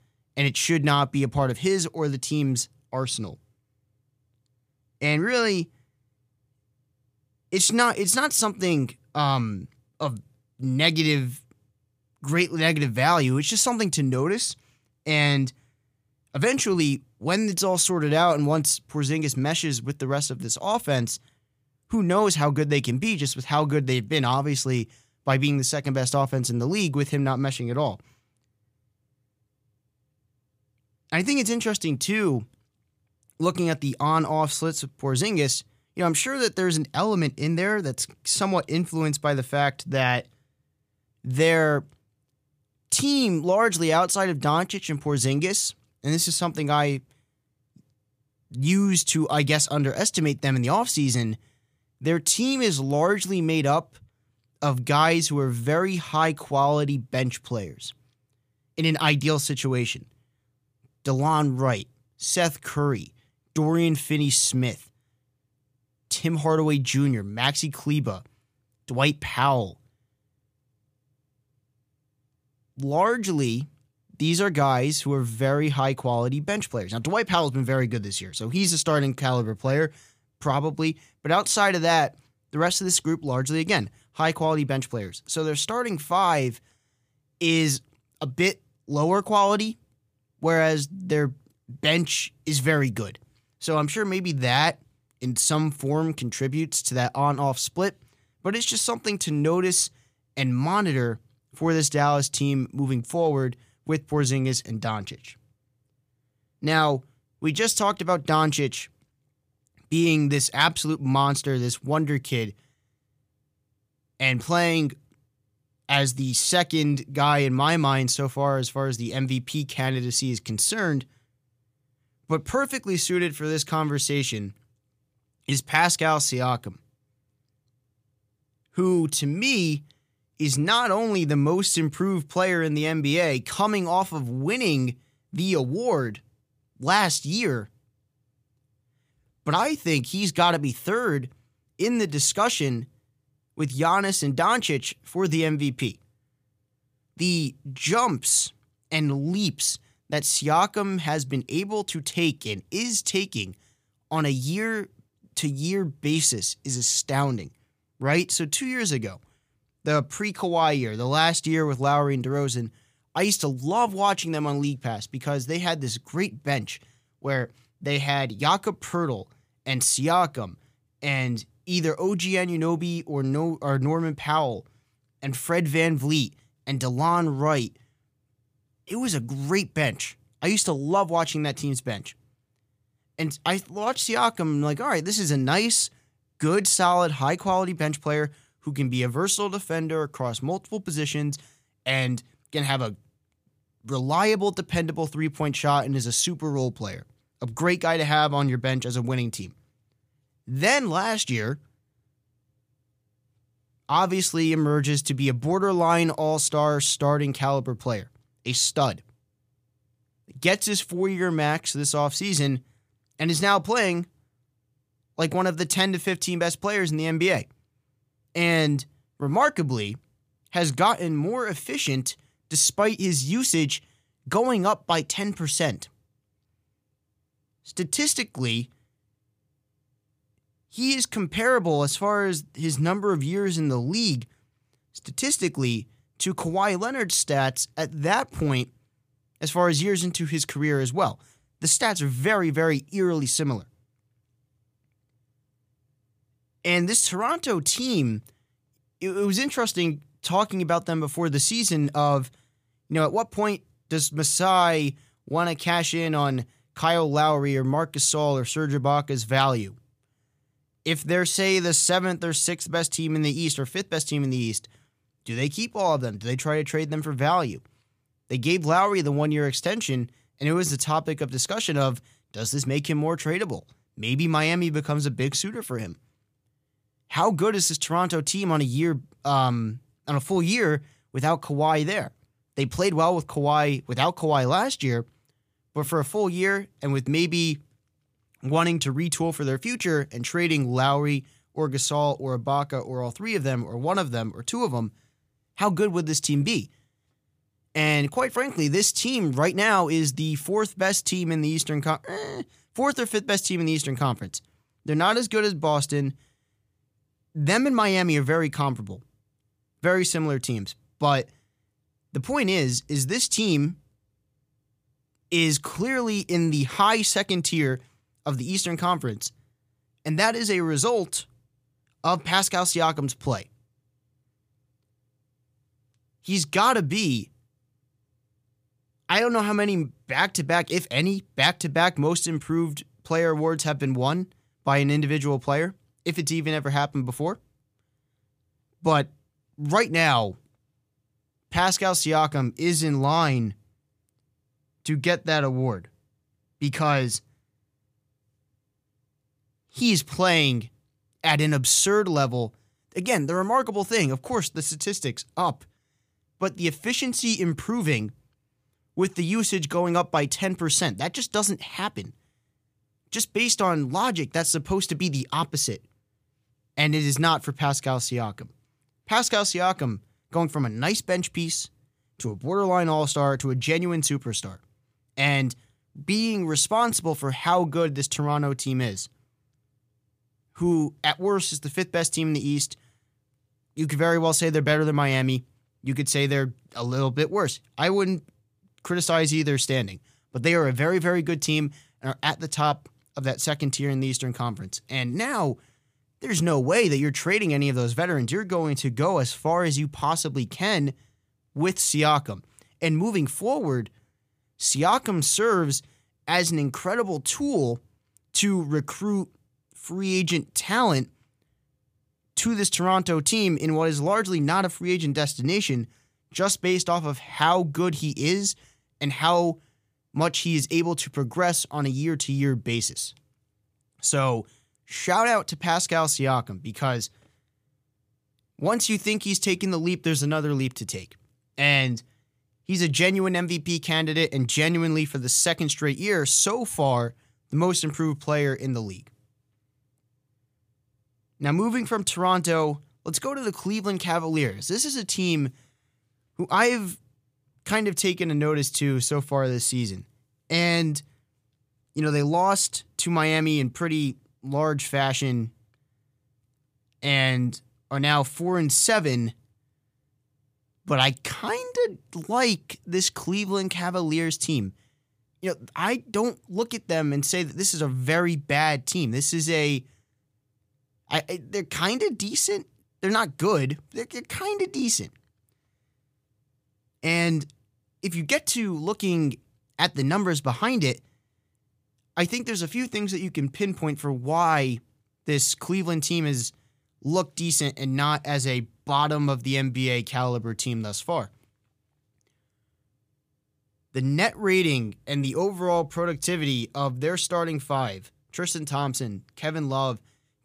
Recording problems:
none

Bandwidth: 15 kHz